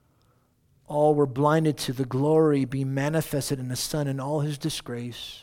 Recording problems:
none

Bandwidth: 17 kHz